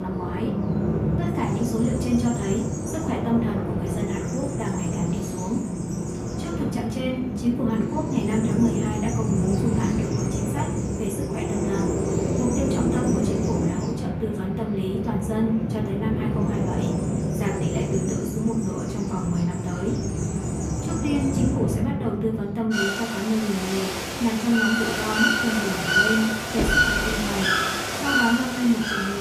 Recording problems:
off-mic speech; far
room echo; slight; dies away in 0.5 s
animal sounds; very loud; throughout; 2 dB above the speech
abrupt cut into speech; at the start and the end
door banging; loud; at 27 s; peak level with the speech

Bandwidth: 15 kHz